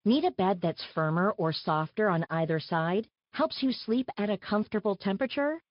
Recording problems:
high frequencies cut off; noticeable; nothing above 5 kHz
garbled, watery; slightly

